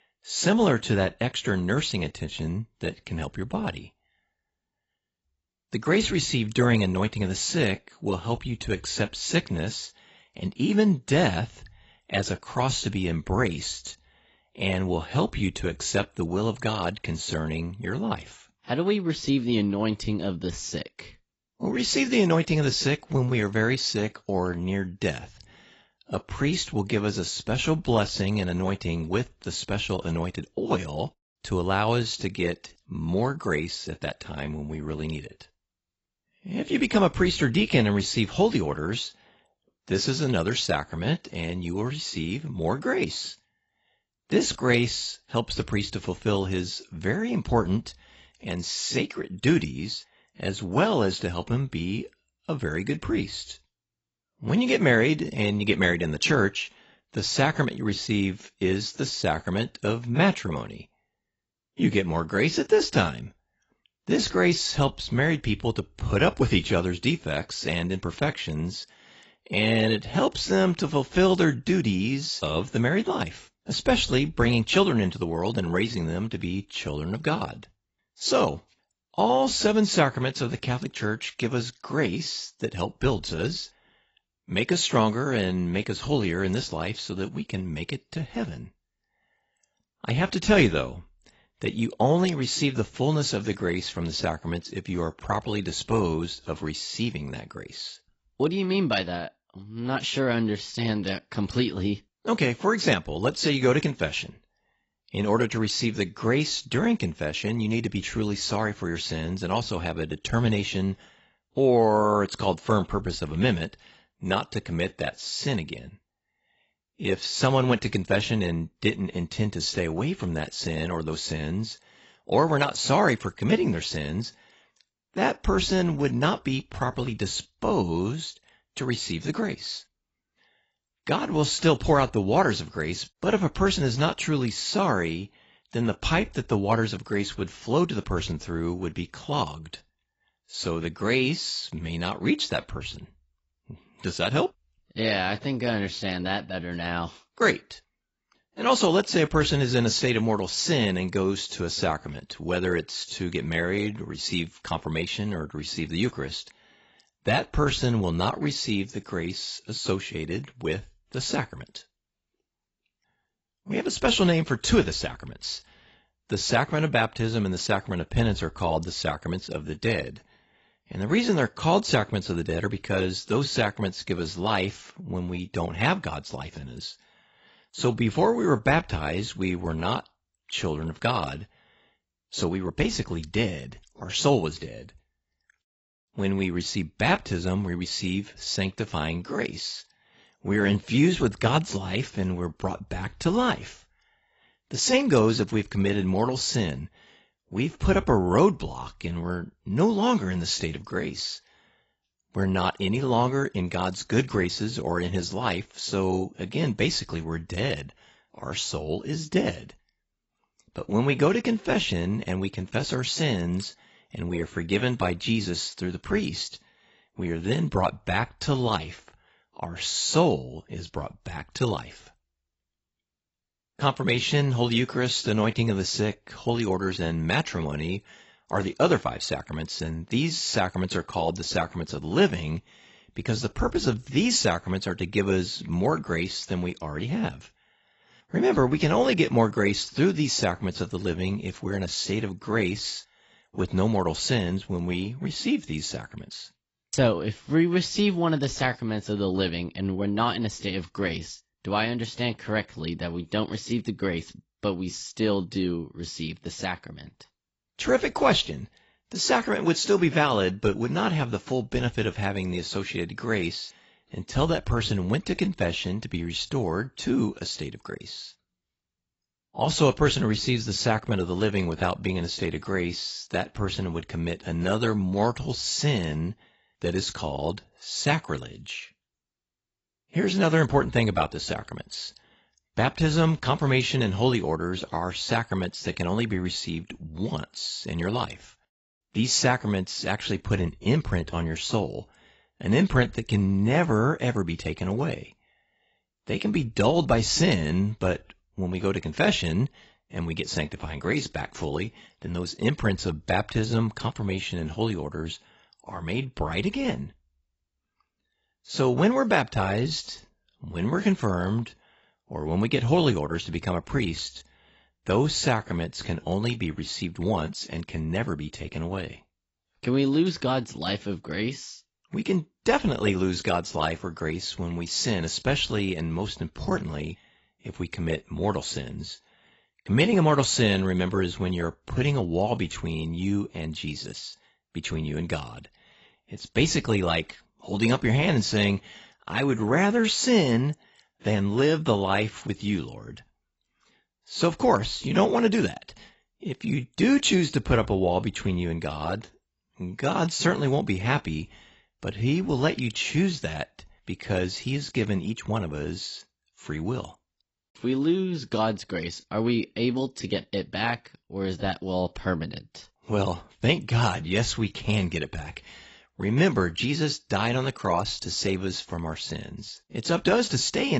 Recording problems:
garbled, watery; badly; nothing above 7.5 kHz
abrupt cut into speech; at the end

